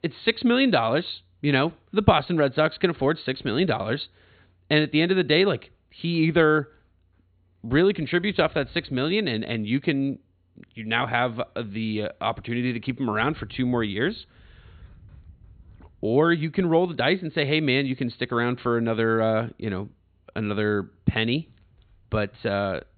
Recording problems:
high frequencies cut off; severe; nothing above 4.5 kHz

